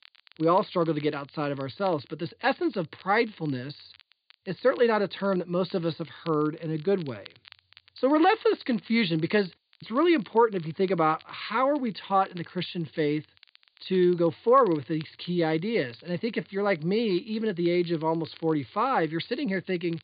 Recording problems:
high frequencies cut off; severe; nothing above 4.5 kHz
crackle, like an old record; faint; 25 dB below the speech
hiss; very faint; throughout; 45 dB below the speech

